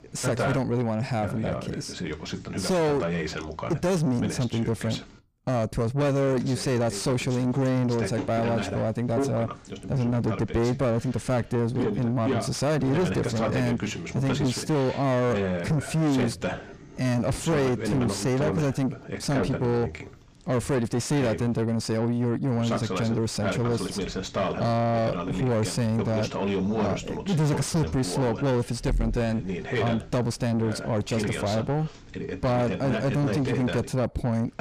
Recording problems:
distortion; heavy; 6 dB below the speech
voice in the background; loud; throughout; 5 dB below the speech

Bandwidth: 15 kHz